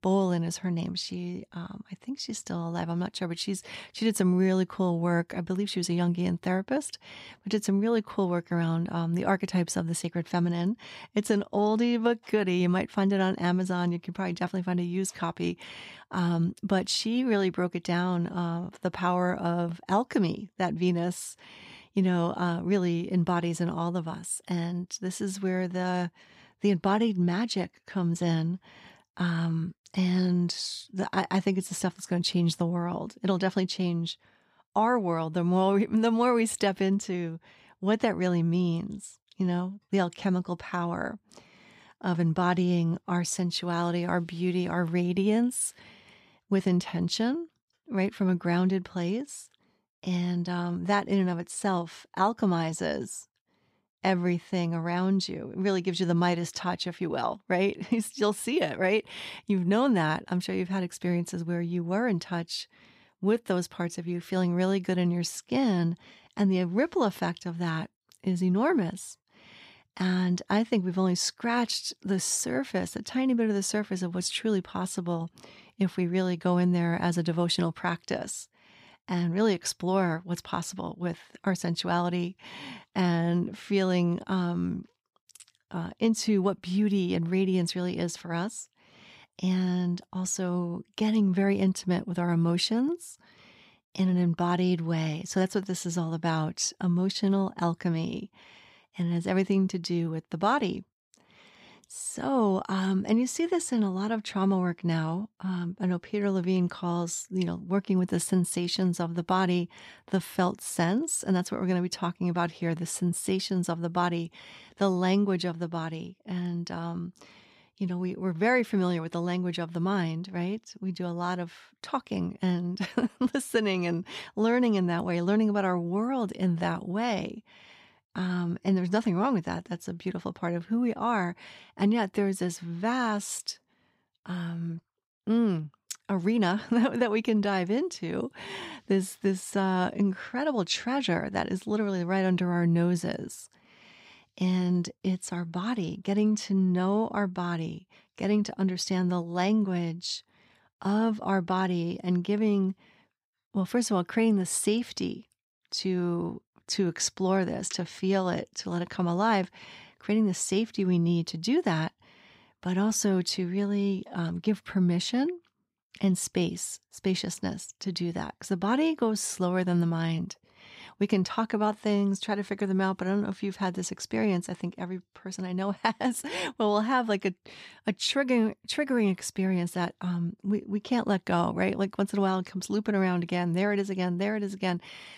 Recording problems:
none

